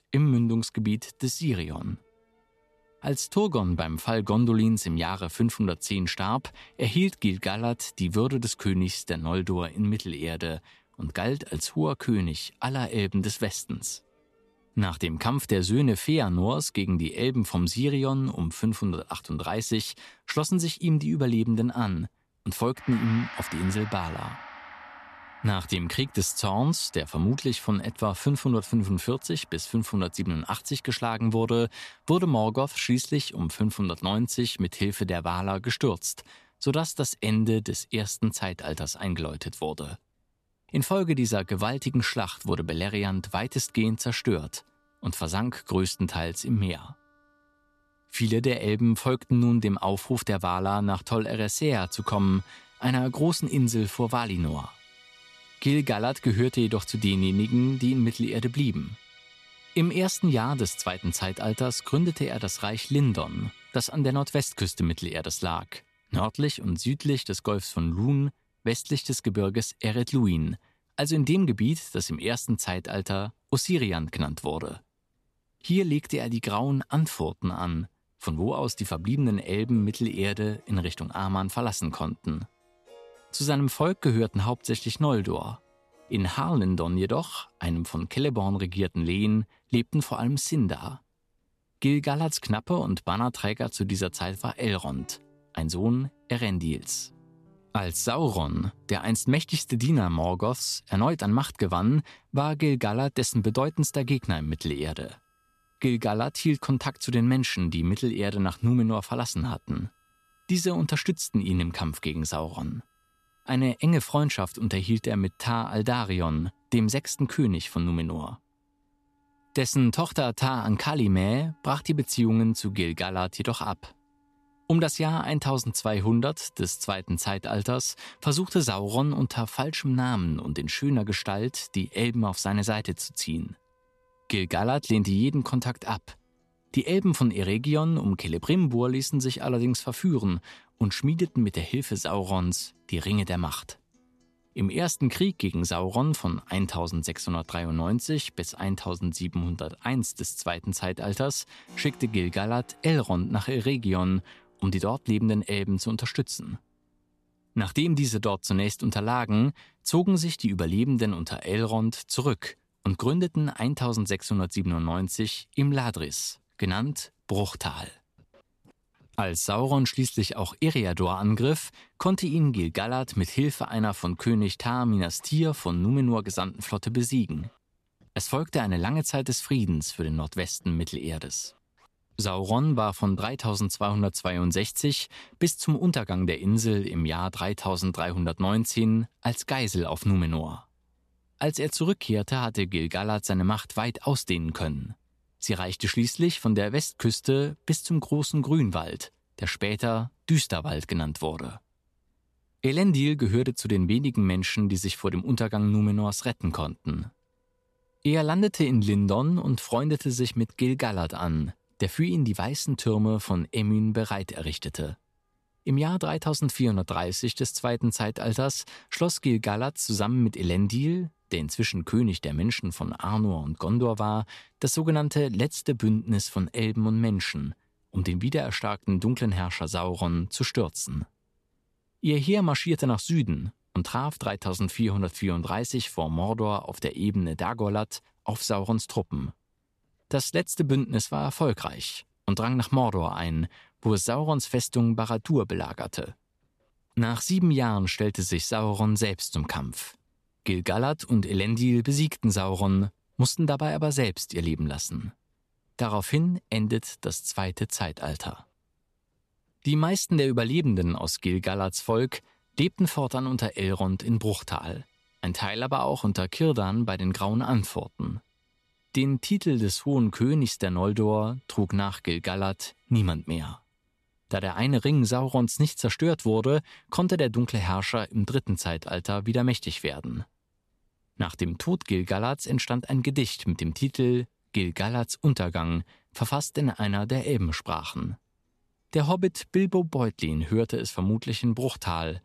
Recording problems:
background music; faint; throughout; 25 dB below the speech

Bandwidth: 13.5 kHz